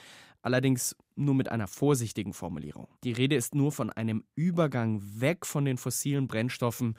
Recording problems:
none

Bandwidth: 15.5 kHz